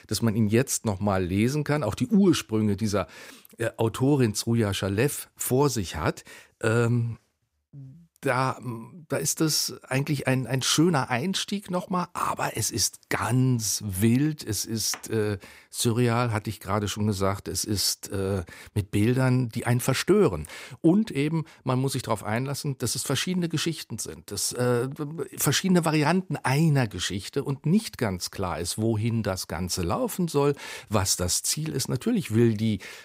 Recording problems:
none

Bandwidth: 15.5 kHz